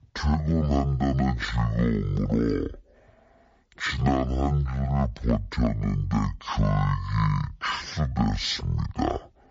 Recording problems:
wrong speed and pitch; too slow and too low; 0.5 times normal speed

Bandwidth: 7.5 kHz